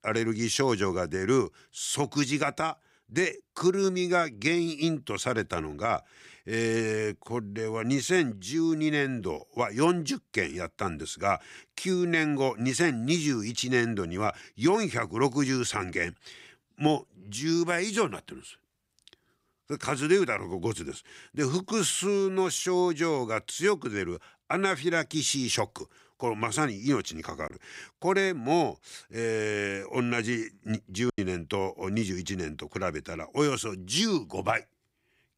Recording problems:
choppy; occasionally; at 31 s; 2% of the speech affected

